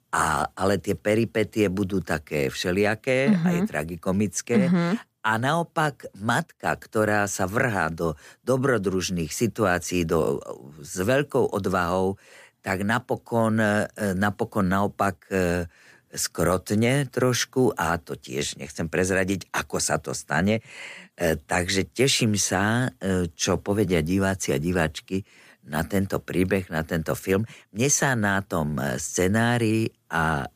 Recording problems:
none

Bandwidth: 15 kHz